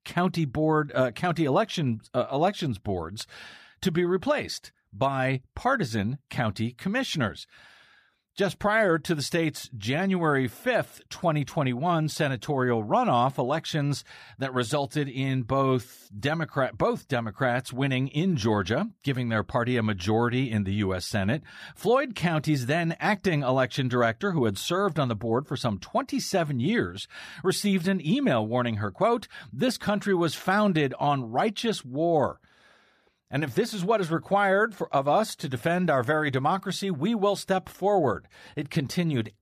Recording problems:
none

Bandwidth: 14.5 kHz